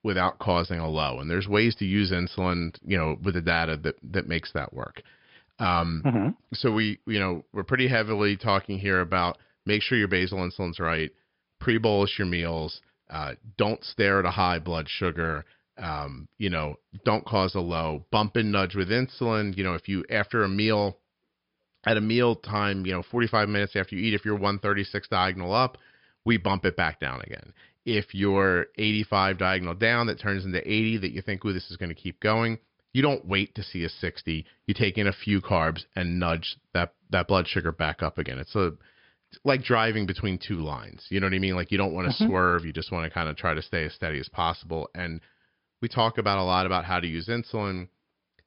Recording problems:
high frequencies cut off; noticeable; nothing above 5.5 kHz

